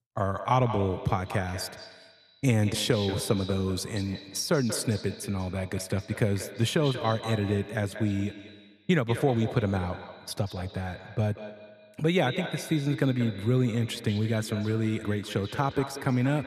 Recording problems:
echo of what is said; strong; throughout; 190 ms later, 10 dB below the speech

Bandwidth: 14 kHz